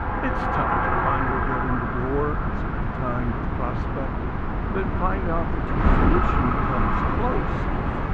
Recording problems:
muffled; very; fading above 2 kHz
traffic noise; very loud; throughout; 2 dB above the speech
wind noise on the microphone; heavy; as loud as the speech

